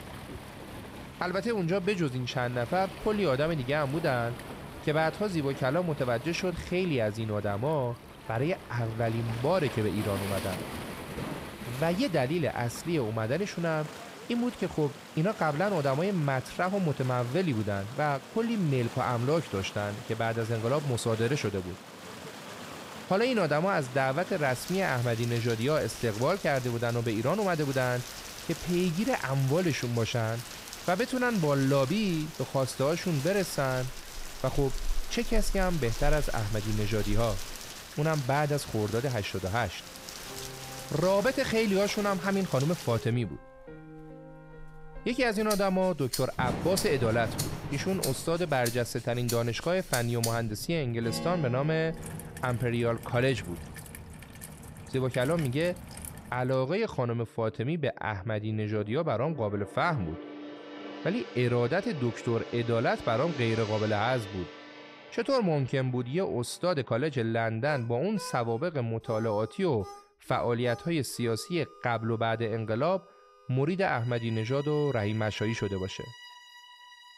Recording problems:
rain or running water; noticeable; until 56 s; 10 dB below the speech
background music; noticeable; from 40 s on; 15 dB below the speech

